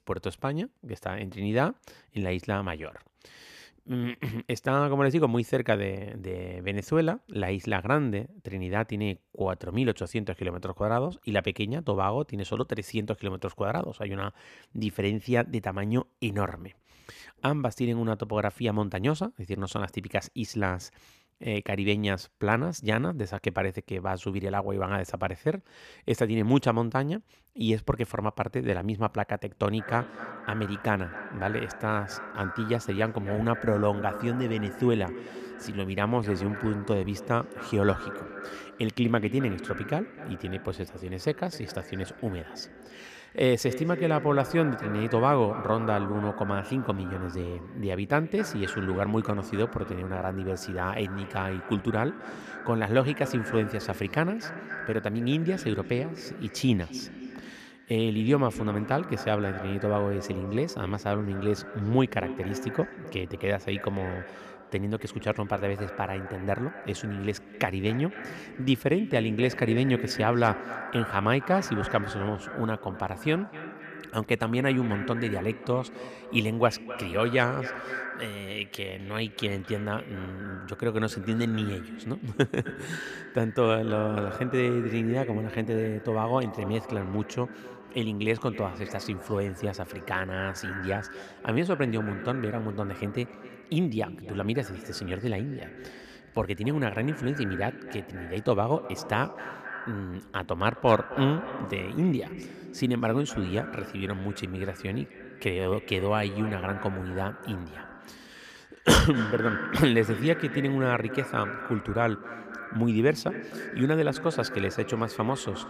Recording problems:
echo of what is said; strong; from 30 s on; 260 ms later, 10 dB below the speech

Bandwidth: 14.5 kHz